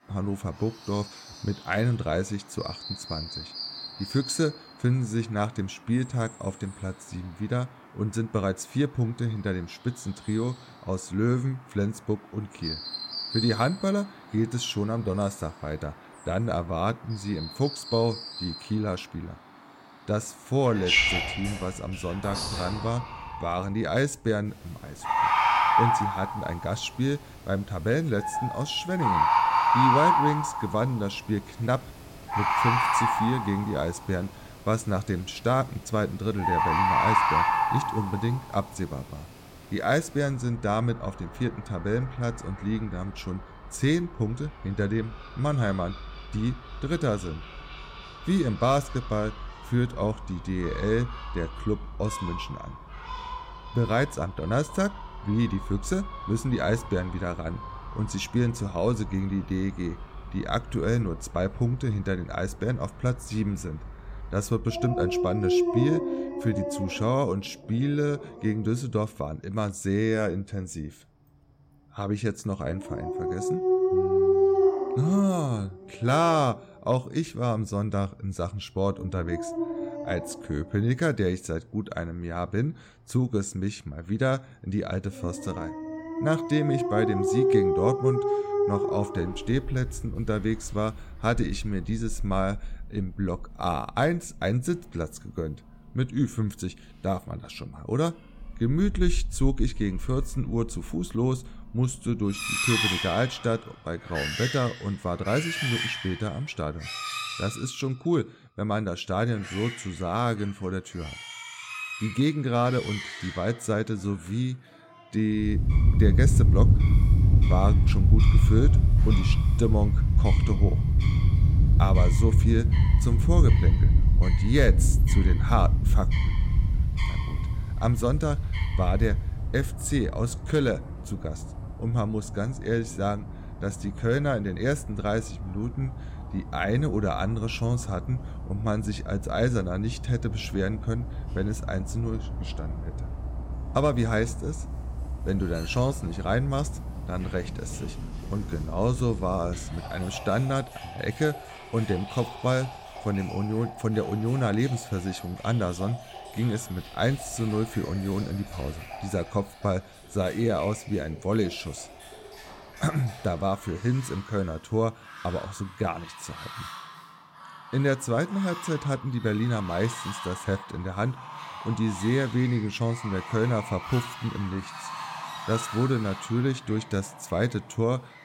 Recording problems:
animal sounds; very loud; throughout; 1 dB above the speech

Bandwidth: 16.5 kHz